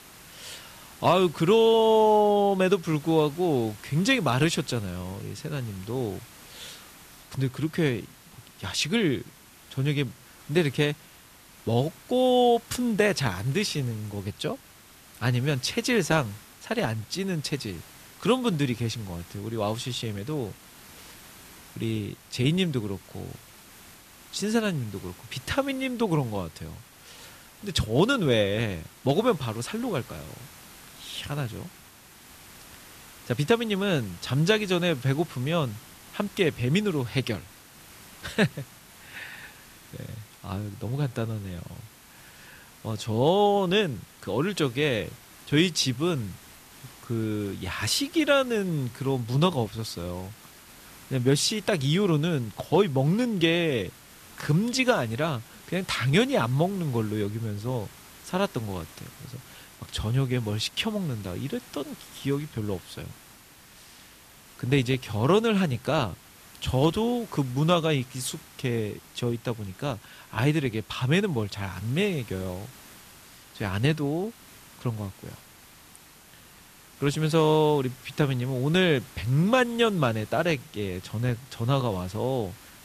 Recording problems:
hiss; faint; throughout; 20 dB below the speech

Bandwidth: 14.5 kHz